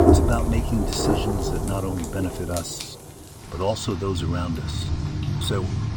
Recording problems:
rain or running water; very loud; throughout; 1 dB above the speech

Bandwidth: 19 kHz